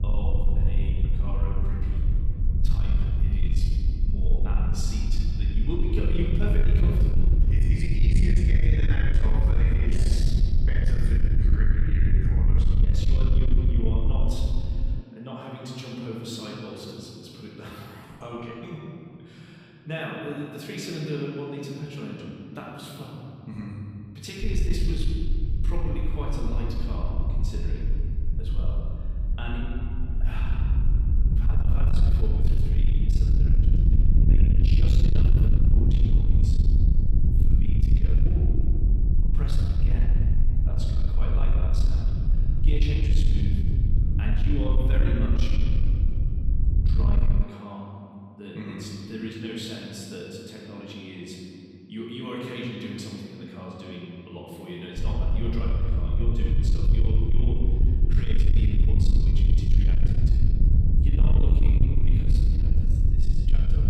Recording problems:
off-mic speech; far
room echo; noticeable; dies away in 3 s
distortion; slight; 10 dB below the speech
low rumble; loud; until 15 s, from 24 to 47 s and from 55 s on; 3 dB below the speech

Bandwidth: 15.5 kHz